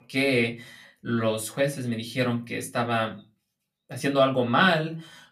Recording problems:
off-mic speech; far
room echo; very slight; dies away in 0.2 s

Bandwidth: 14.5 kHz